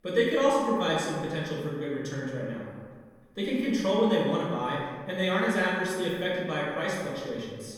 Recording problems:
off-mic speech; far
room echo; noticeable; dies away in 1.4 s

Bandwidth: 18 kHz